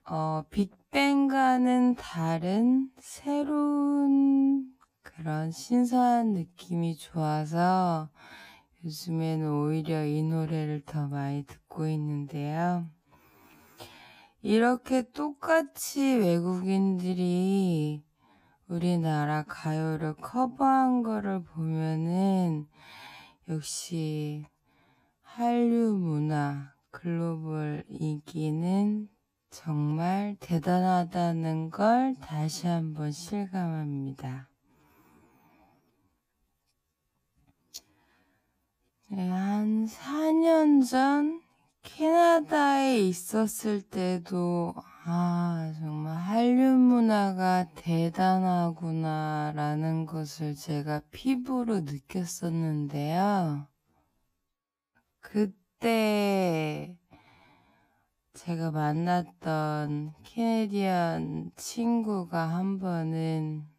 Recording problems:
wrong speed, natural pitch; too slow; 0.5 times normal speed

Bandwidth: 15 kHz